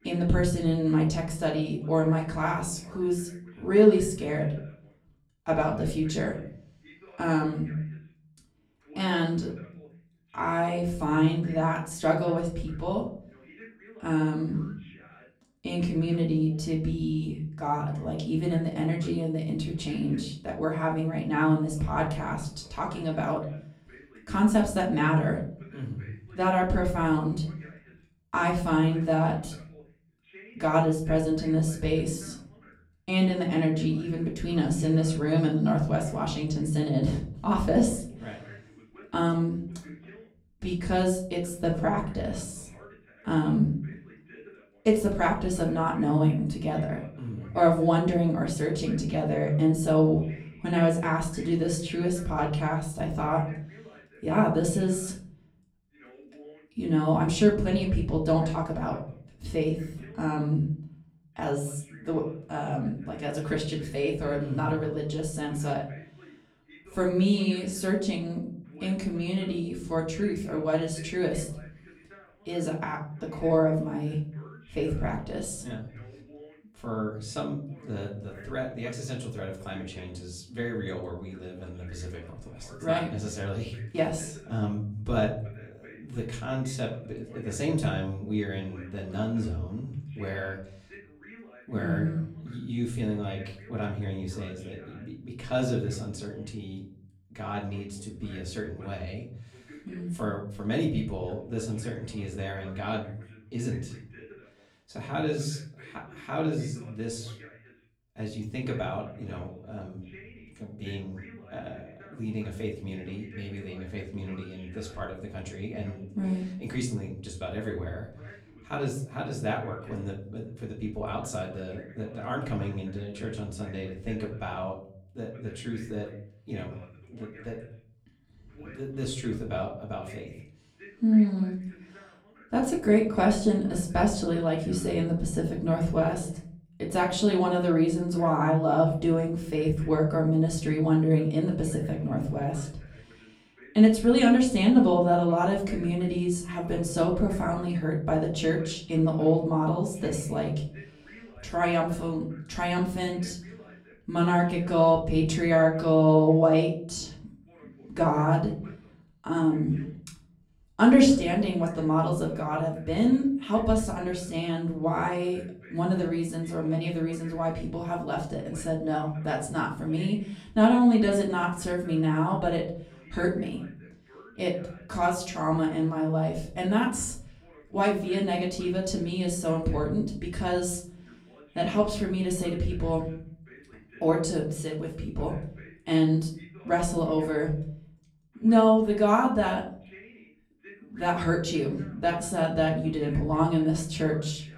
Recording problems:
off-mic speech; far
room echo; slight; dies away in 0.5 s
voice in the background; faint; throughout; 25 dB below the speech

